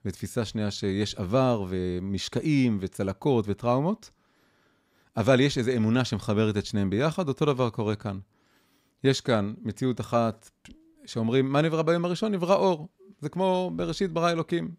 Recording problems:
none

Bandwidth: 15.5 kHz